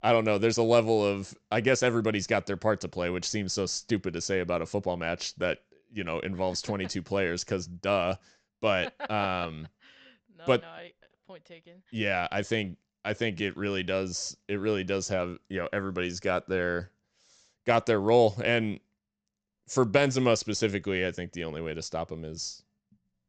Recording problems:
high frequencies cut off; noticeable; nothing above 8 kHz

